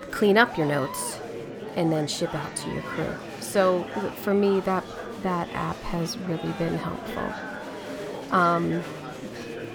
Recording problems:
murmuring crowd; loud; throughout; 10 dB below the speech

